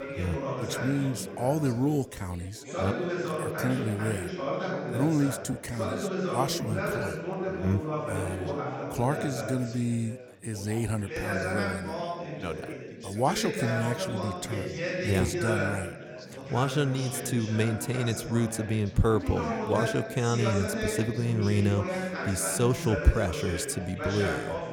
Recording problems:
chatter from many people; loud; throughout; 3 dB below the speech

